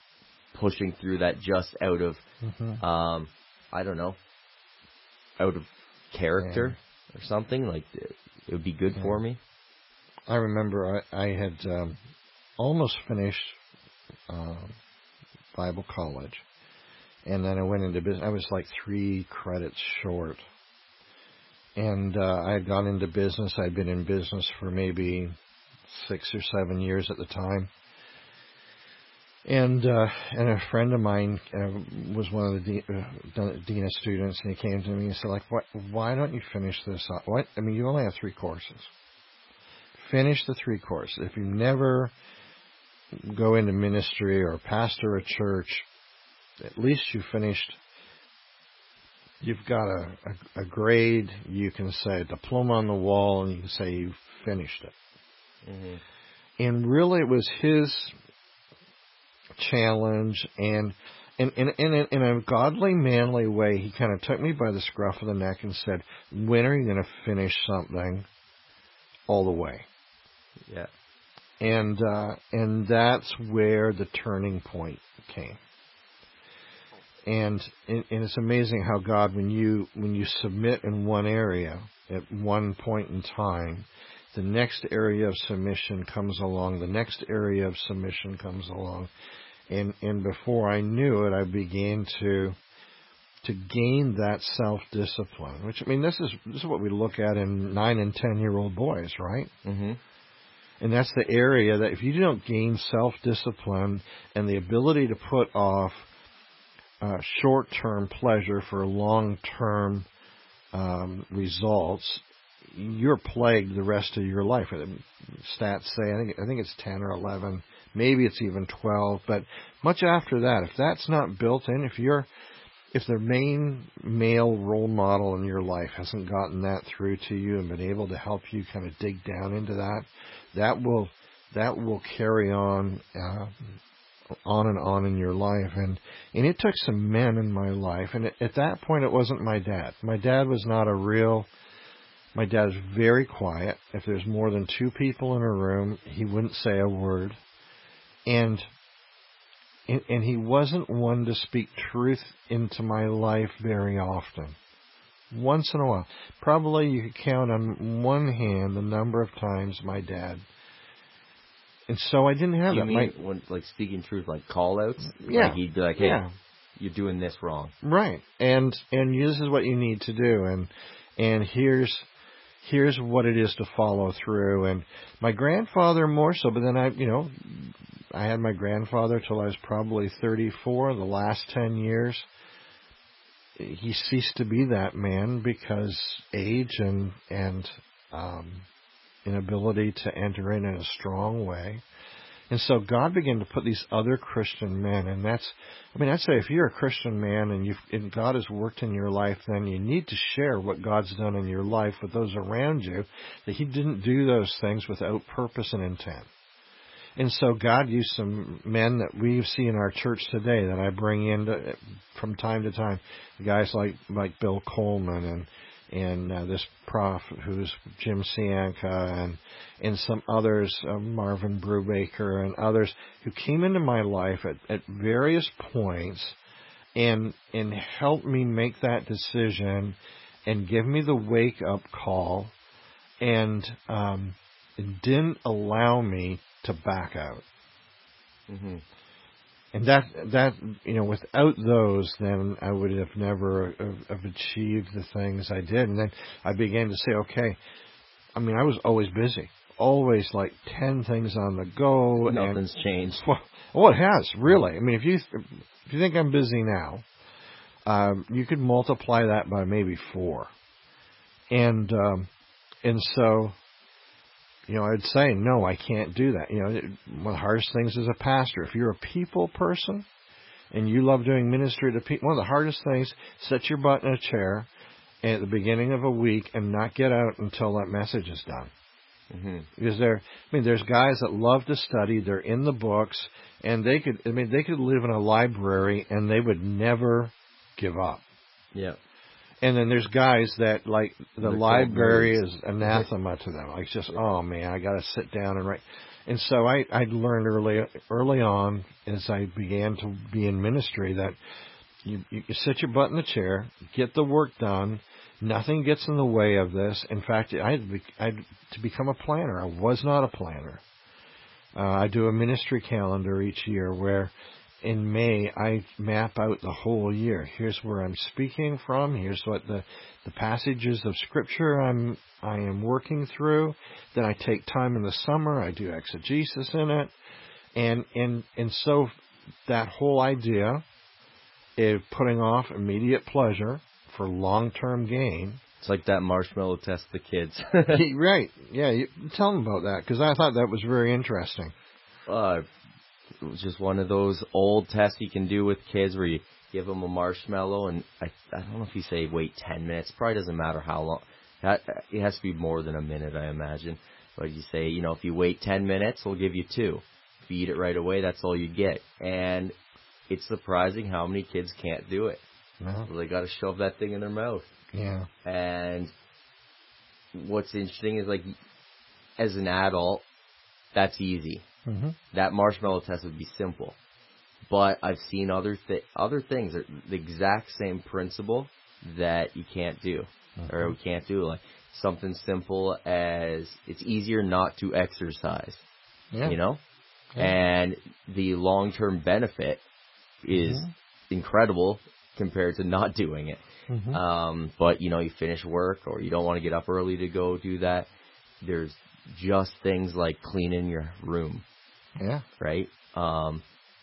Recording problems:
garbled, watery; badly; nothing above 5.5 kHz
hiss; faint; throughout; 30 dB below the speech

